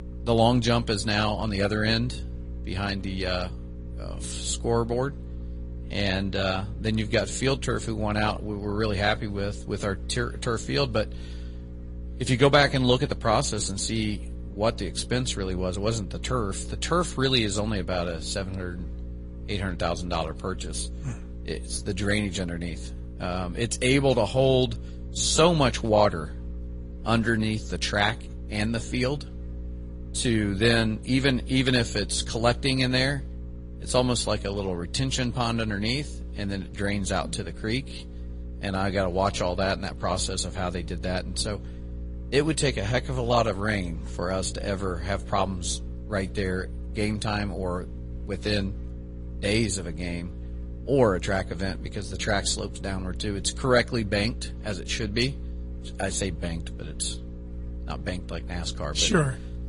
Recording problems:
garbled, watery; slightly; nothing above 10.5 kHz
electrical hum; faint; throughout; 60 Hz, 20 dB below the speech

